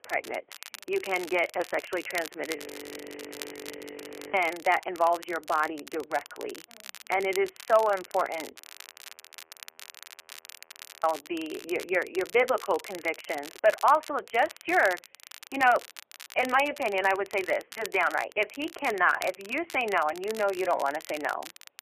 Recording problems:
phone-call audio; poor line; nothing above 3 kHz
crackle, like an old record; noticeable; 15 dB below the speech
audio freezing; at 2.5 s for 2 s and at 8.5 s for 2.5 s

